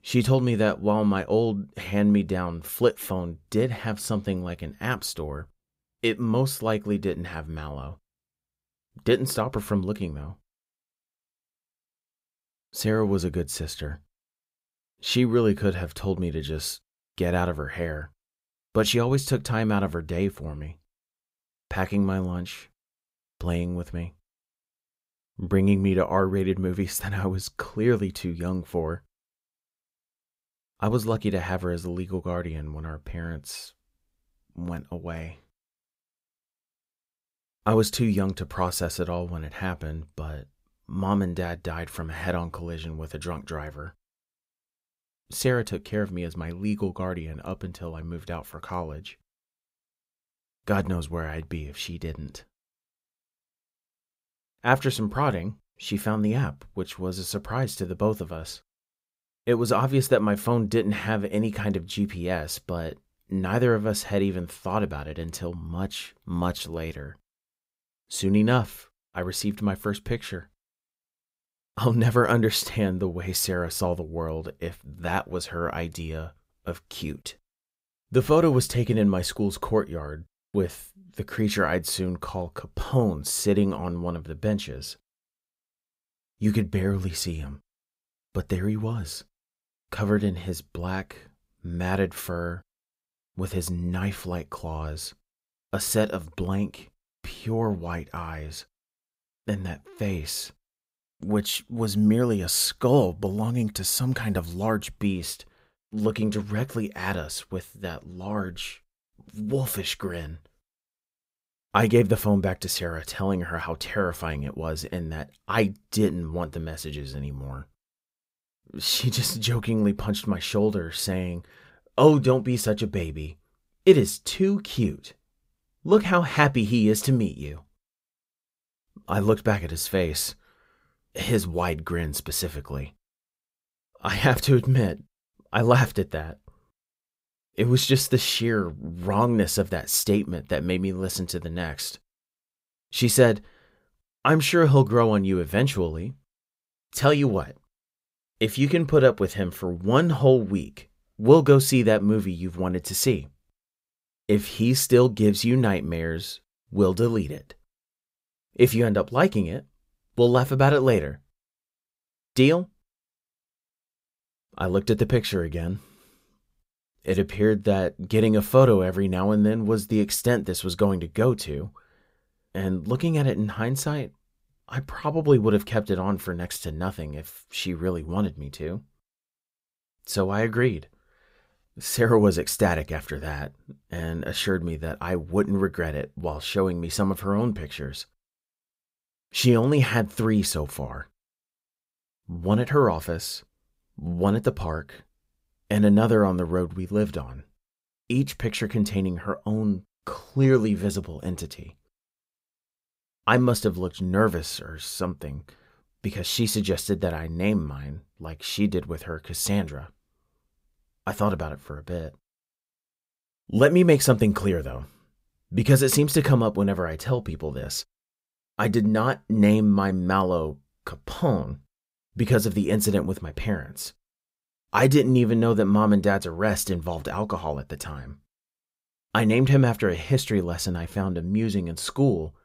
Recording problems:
none

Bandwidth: 15.5 kHz